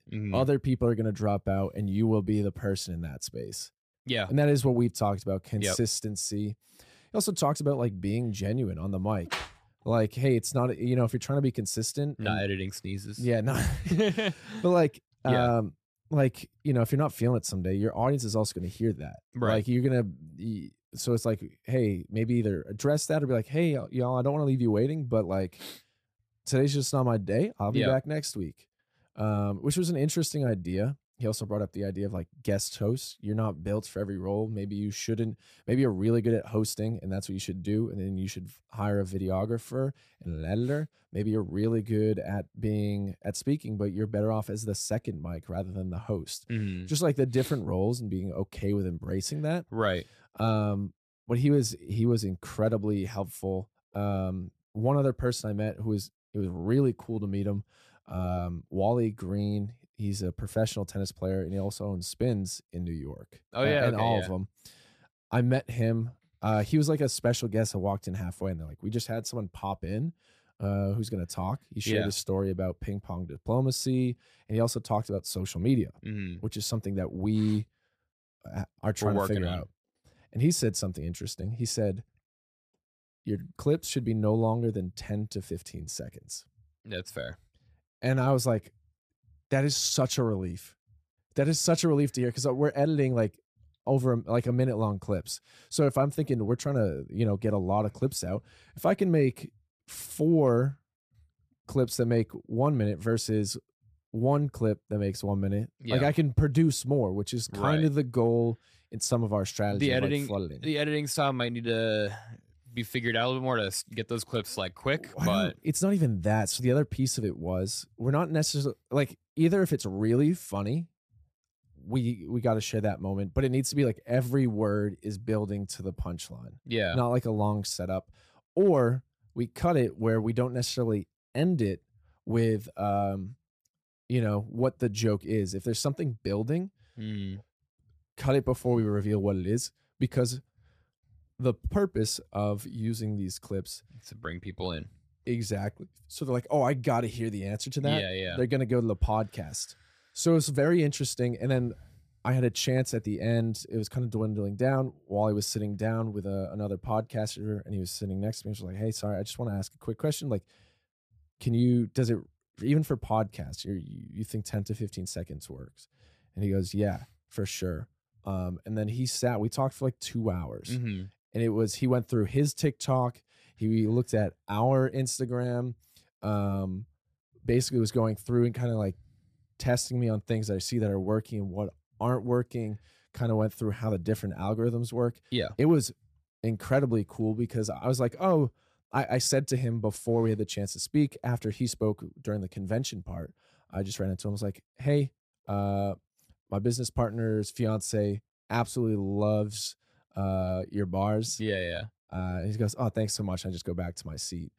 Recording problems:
none

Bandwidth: 14.5 kHz